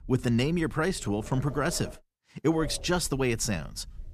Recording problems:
wind noise on the microphone; occasional gusts; until 2 s and from 2.5 s on; 15 dB below the speech

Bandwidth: 14.5 kHz